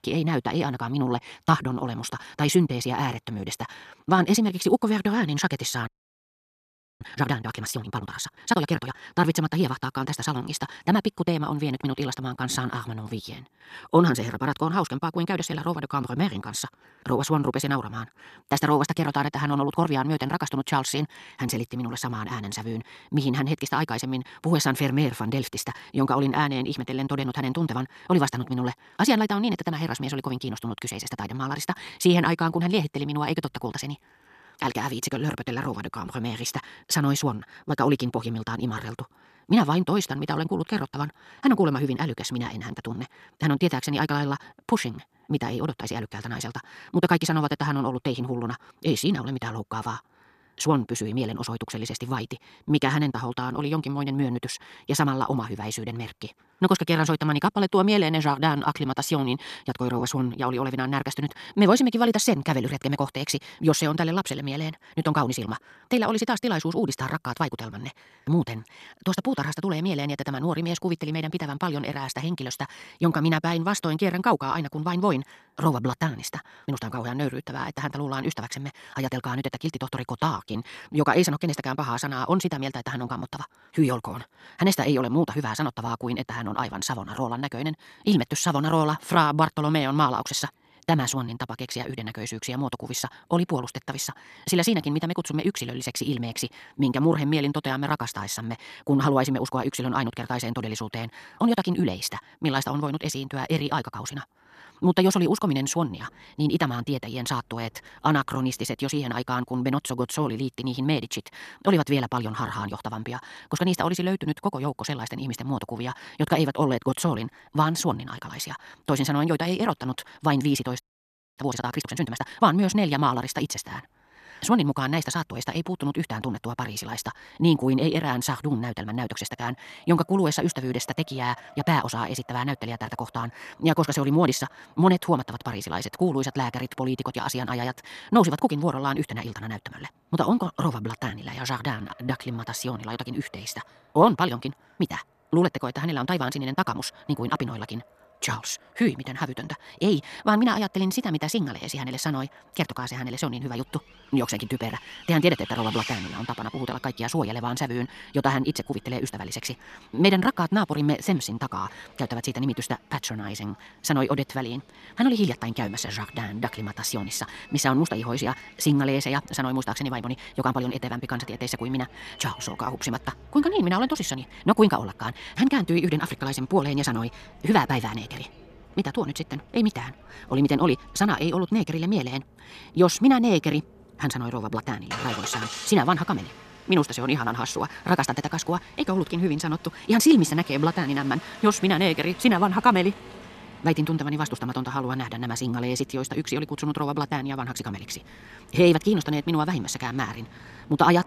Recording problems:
wrong speed, natural pitch; too fast; 1.6 times normal speed
traffic noise; noticeable; throughout; 20 dB below the speech
audio freezing; at 6 s for 1 s and at 2:01 for 0.5 s

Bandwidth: 14 kHz